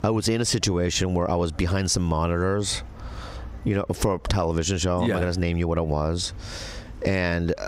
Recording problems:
squashed, flat; heavily

